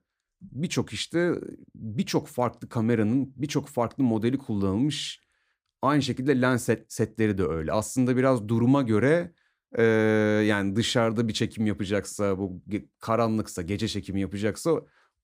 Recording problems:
none

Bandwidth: 15.5 kHz